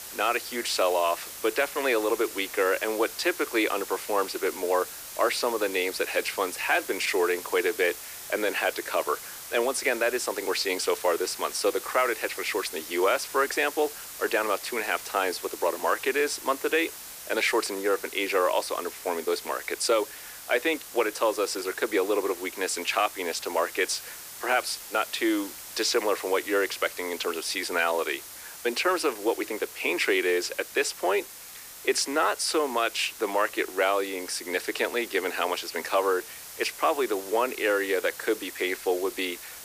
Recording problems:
thin; very; fading below 350 Hz
hiss; noticeable; throughout; 10 dB below the speech

